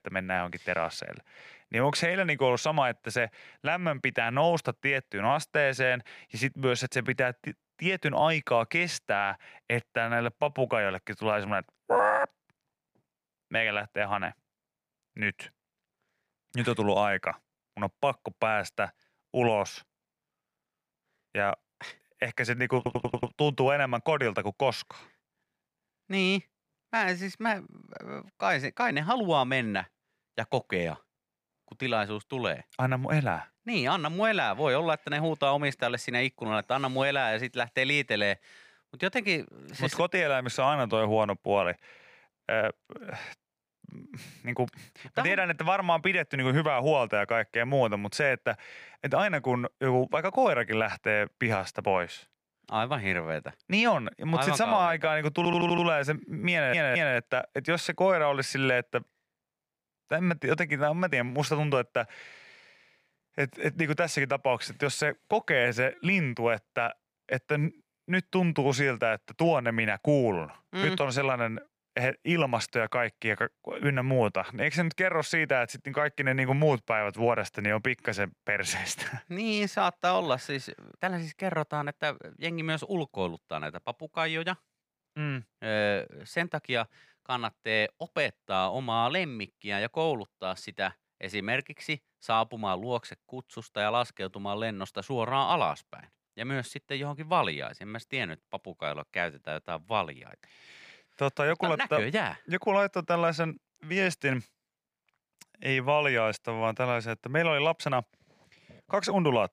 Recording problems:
audio stuttering; at 23 s, at 55 s and at 57 s

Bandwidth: 15 kHz